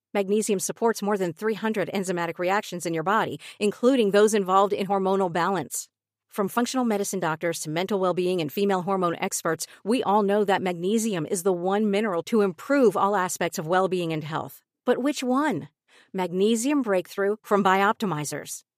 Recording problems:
none

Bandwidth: 15 kHz